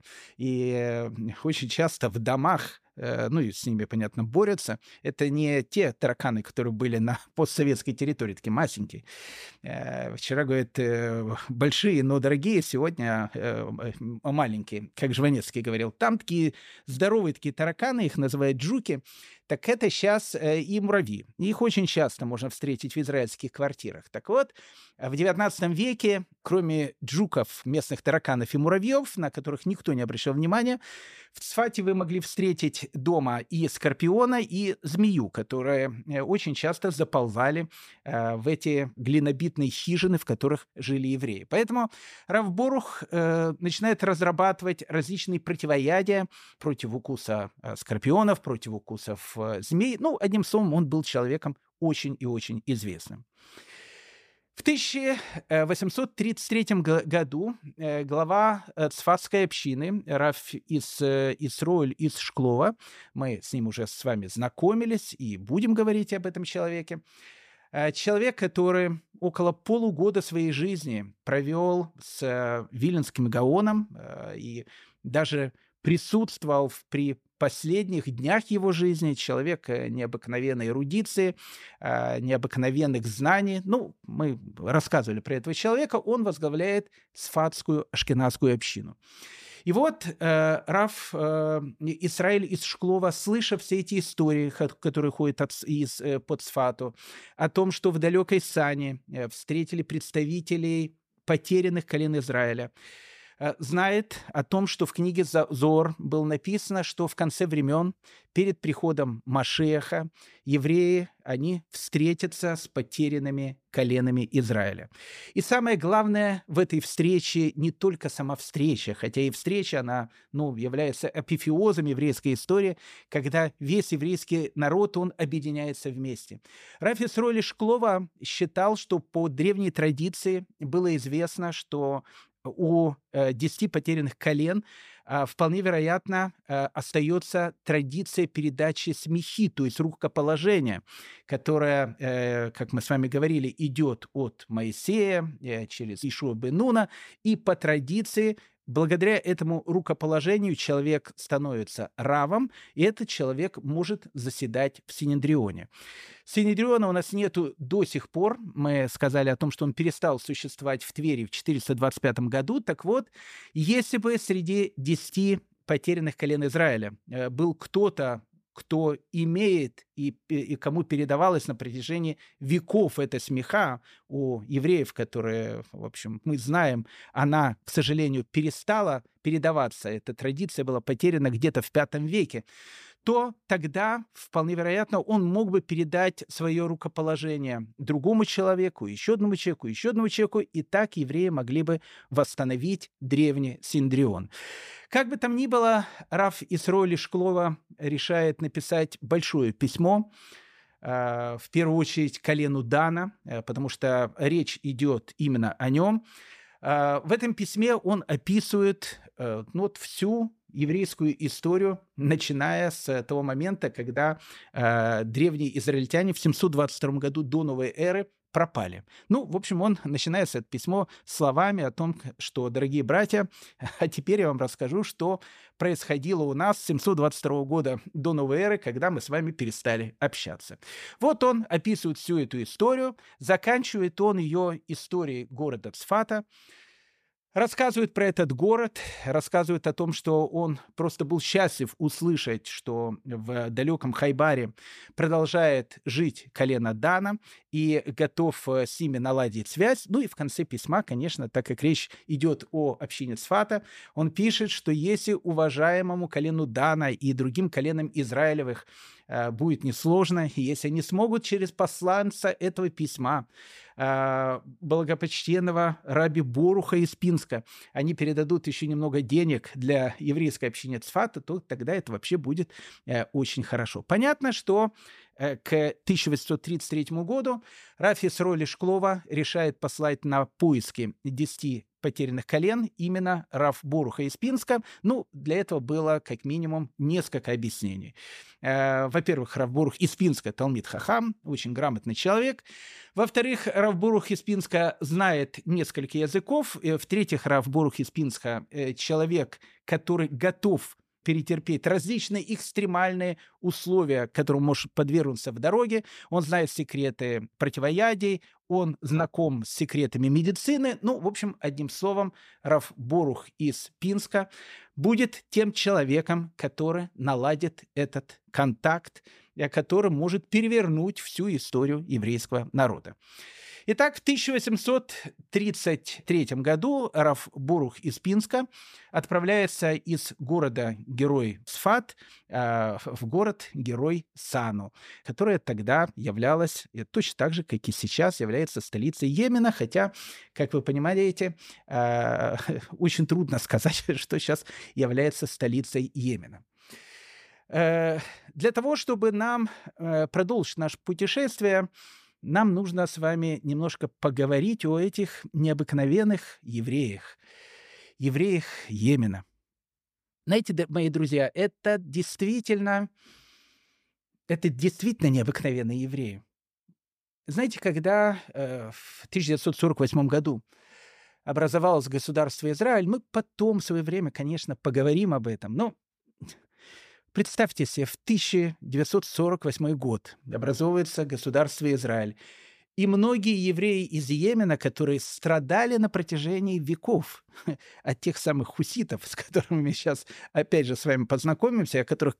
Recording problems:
none

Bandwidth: 14.5 kHz